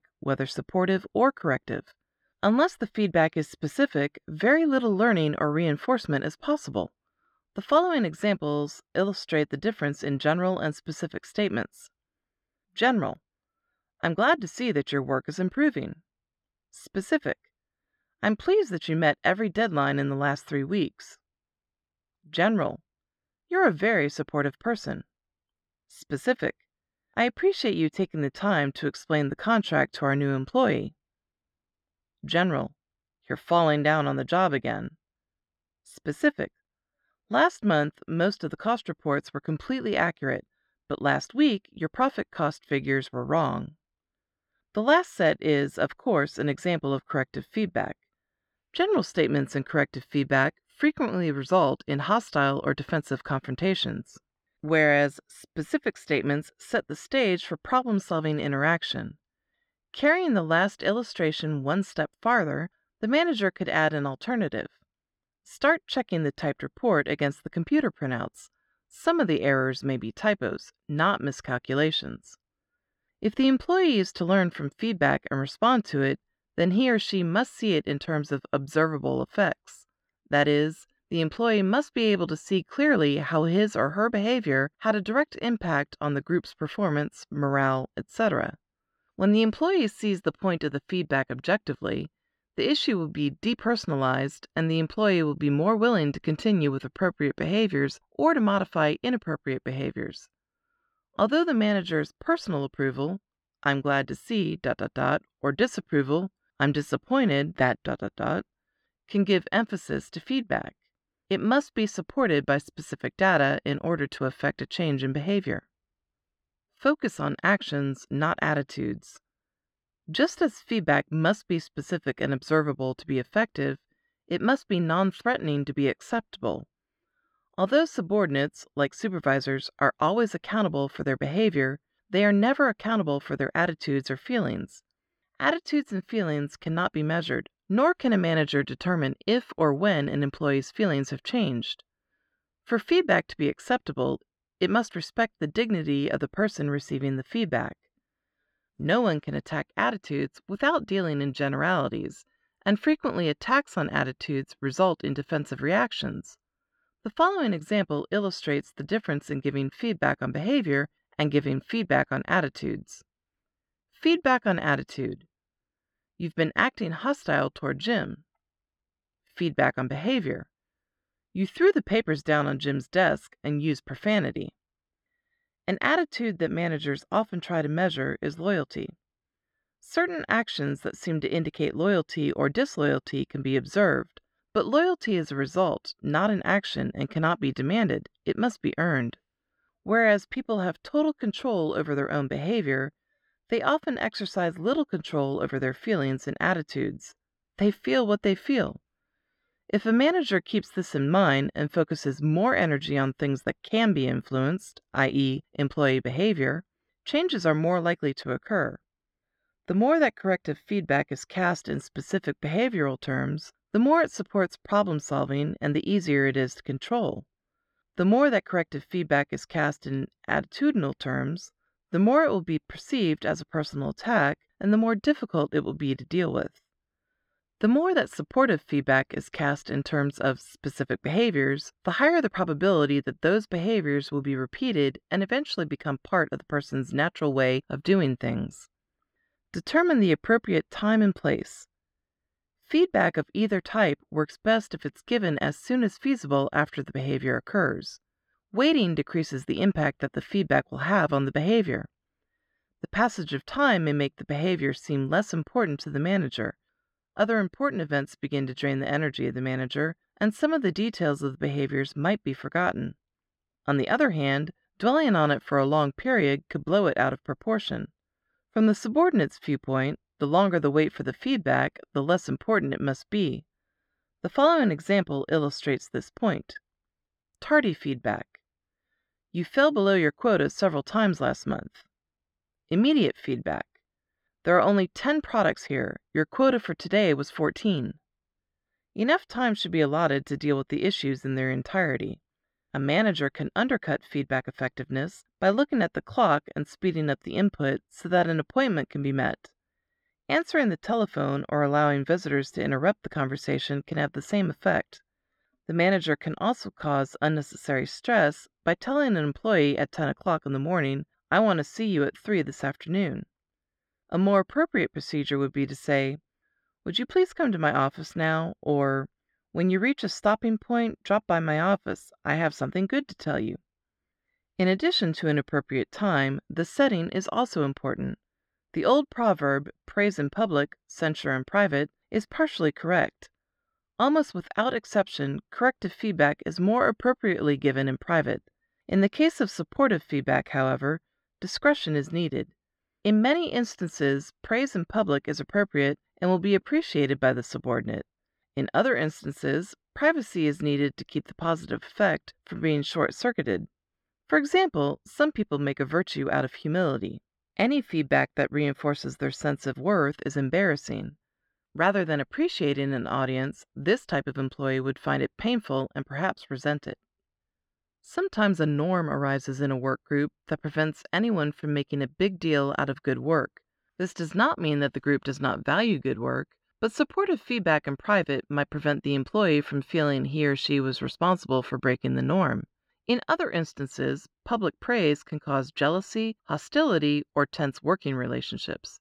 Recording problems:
muffled; slightly; fading above 3 kHz

